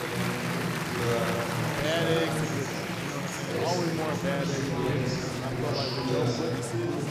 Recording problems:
murmuring crowd; very loud; throughout; 4 dB above the speech

